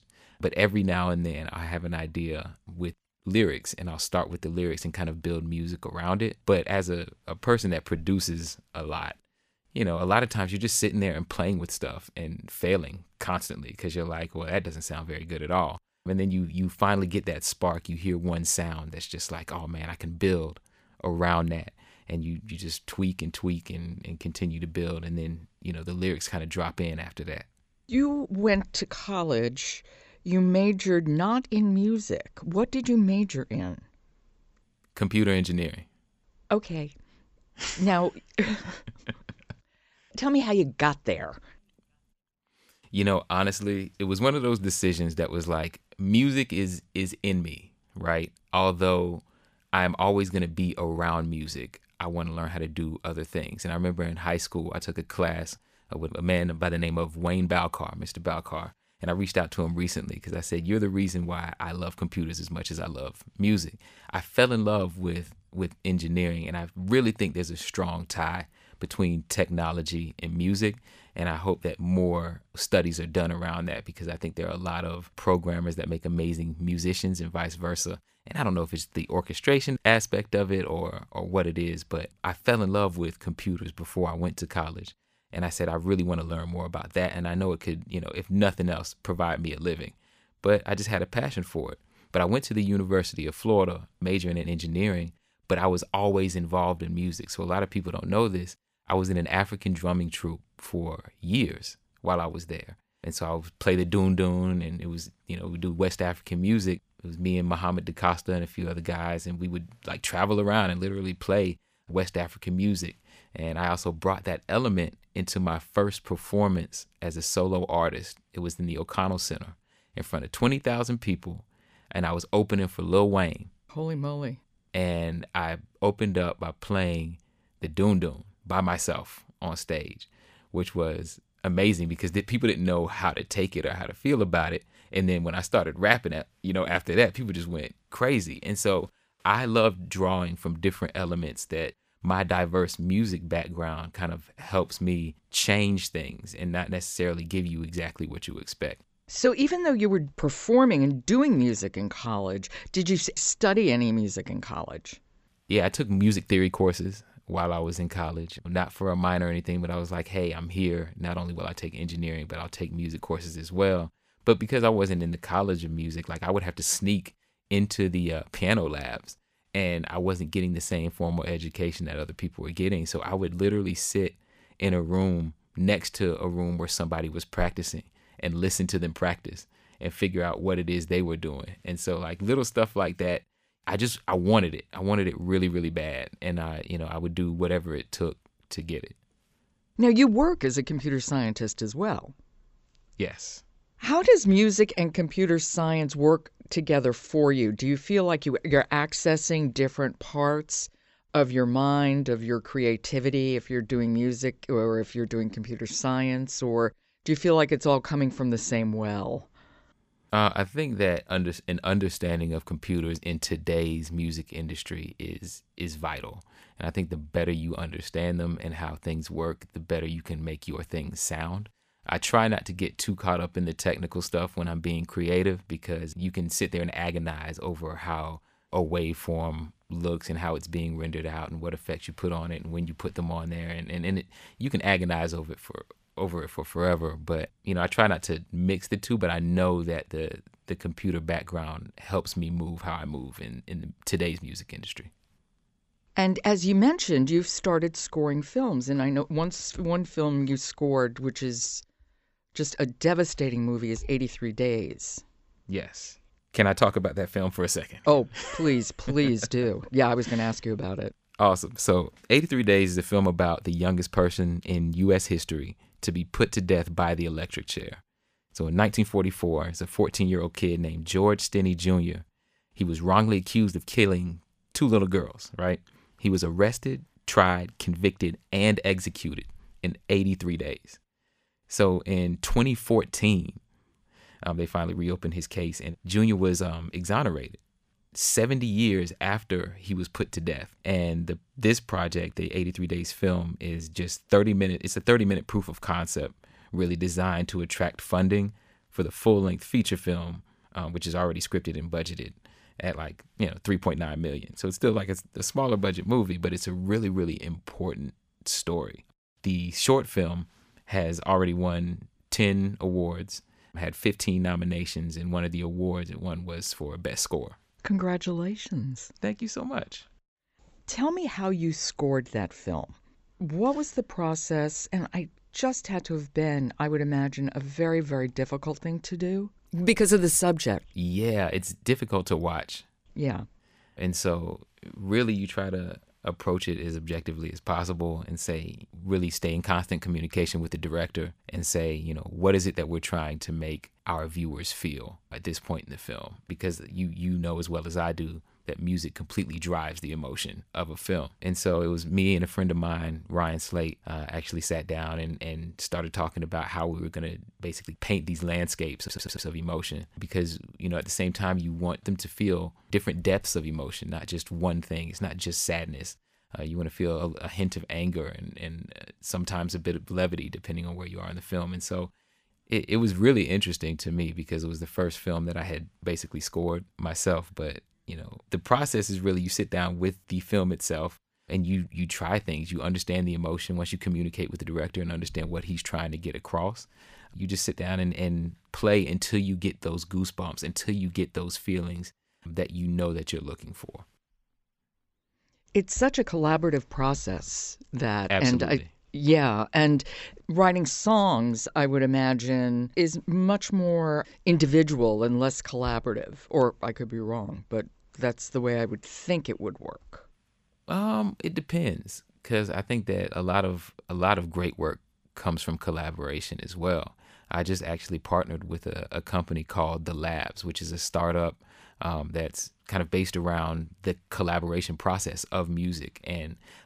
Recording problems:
audio stuttering; at 5:59

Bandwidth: 15 kHz